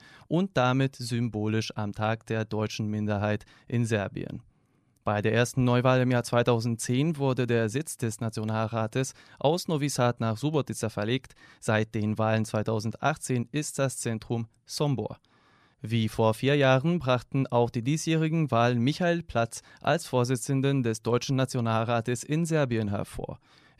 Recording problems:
none

